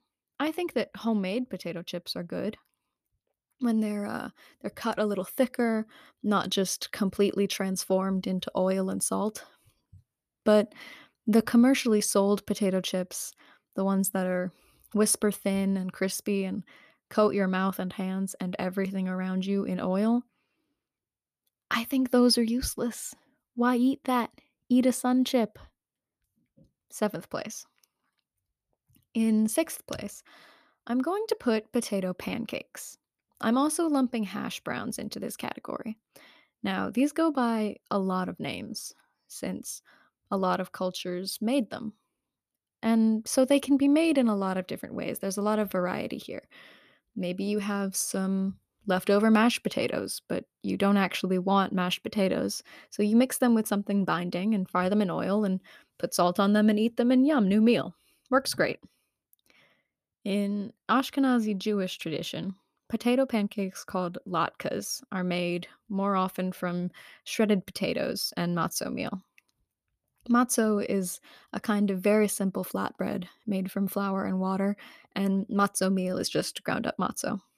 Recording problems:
none

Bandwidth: 14.5 kHz